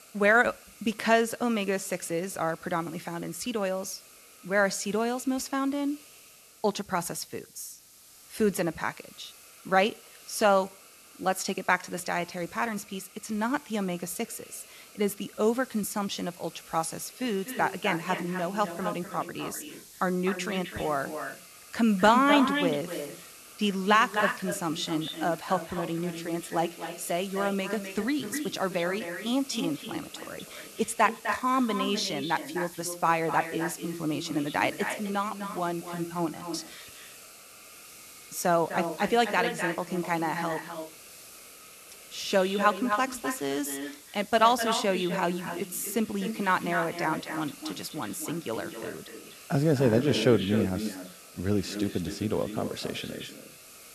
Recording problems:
echo of what is said; strong; from 17 s on; 250 ms later, 7 dB below the speech
hiss; noticeable; throughout; 20 dB below the speech

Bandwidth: 13.5 kHz